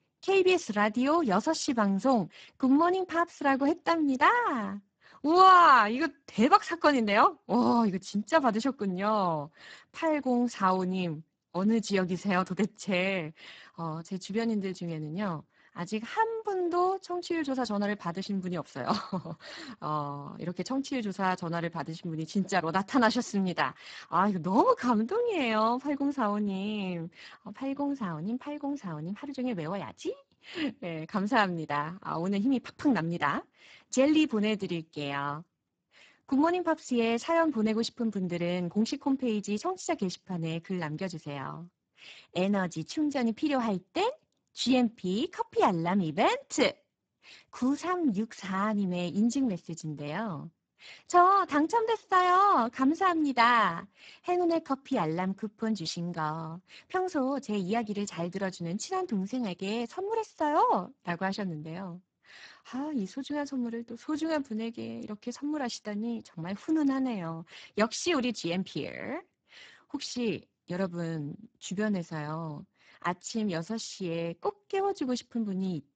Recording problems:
garbled, watery; badly; nothing above 7.5 kHz

